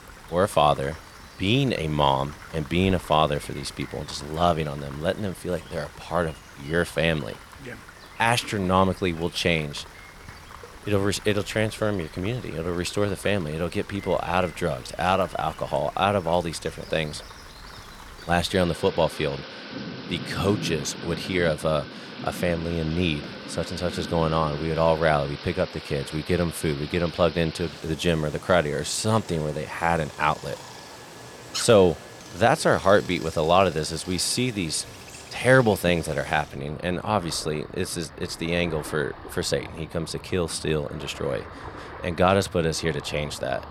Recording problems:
rain or running water; noticeable; throughout; 15 dB below the speech

